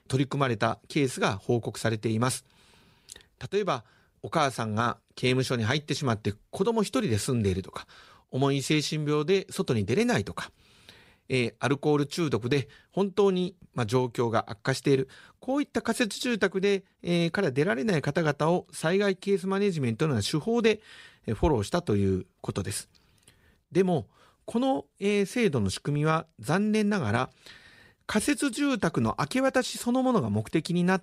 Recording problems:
none

